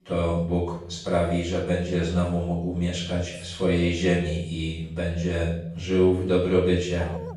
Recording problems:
off-mic speech; far
room echo; noticeable; dies away in 0.7 s
dog barking; faint; at 7 s; peak 15 dB below the speech

